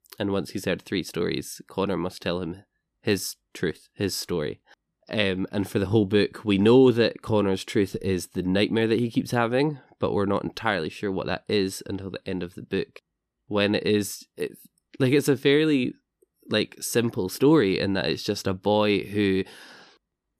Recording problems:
none

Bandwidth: 14.5 kHz